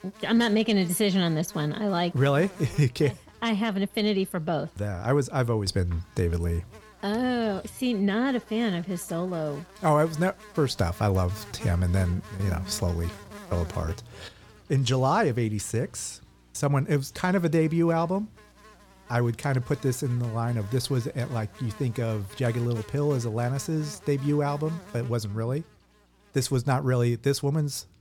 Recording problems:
electrical hum; noticeable; throughout; 60 Hz, 20 dB below the speech

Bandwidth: 18 kHz